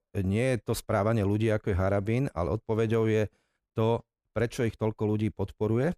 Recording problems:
none

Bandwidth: 14.5 kHz